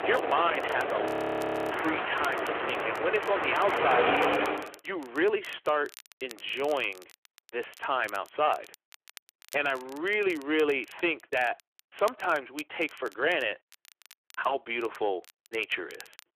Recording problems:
phone-call audio; nothing above 14.5 kHz
distortion; slight; 6% of the sound clipped
train or aircraft noise; very loud; until 4.5 s; as loud as the speech
crackle, like an old record; faint; 20 dB below the speech
audio freezing; at 1 s for 0.5 s

